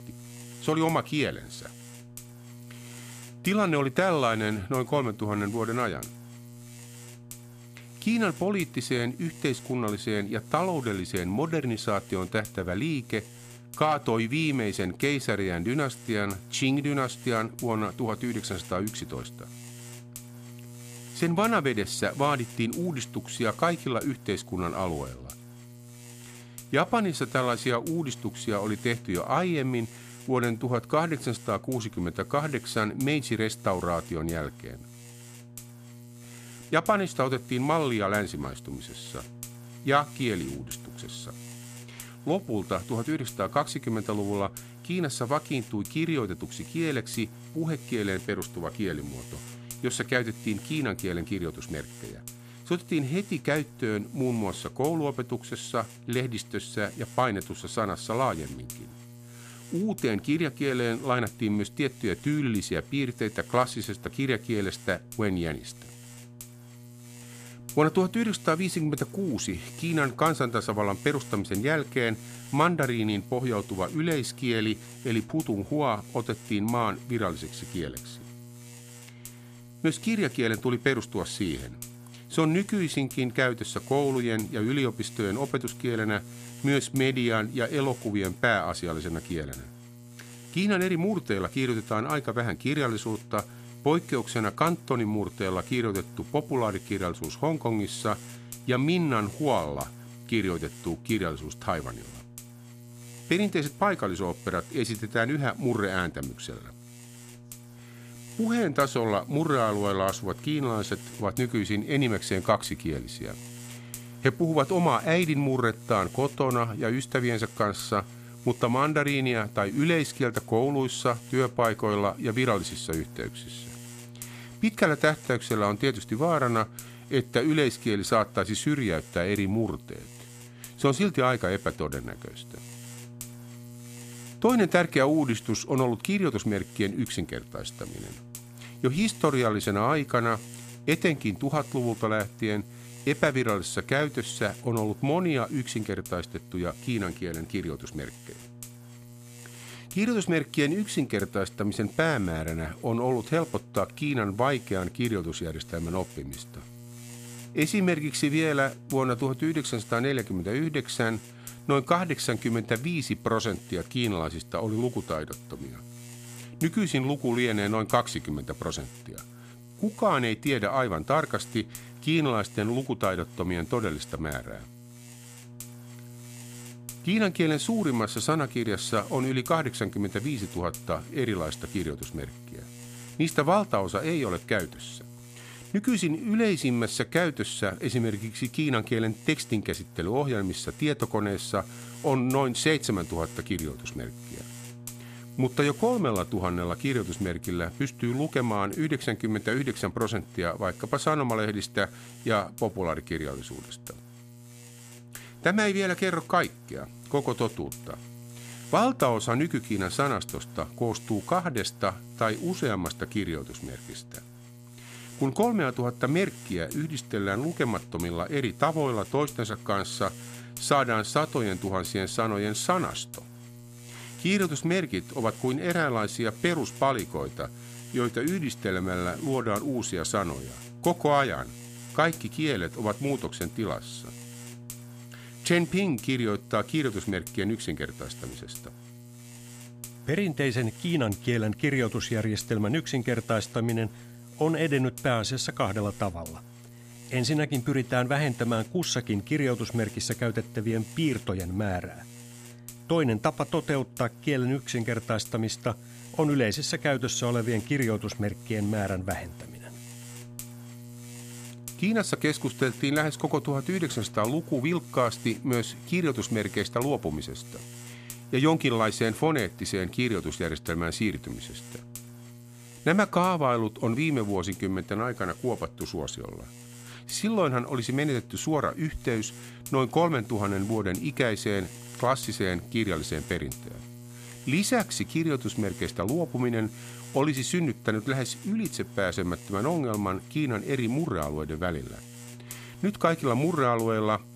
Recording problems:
electrical hum; noticeable; throughout; 60 Hz, 20 dB below the speech

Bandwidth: 14.5 kHz